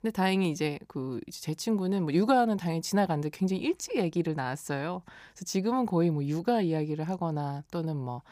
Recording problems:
none

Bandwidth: 15 kHz